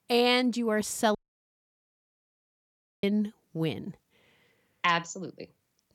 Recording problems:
audio cutting out; at 1 s for 2 s

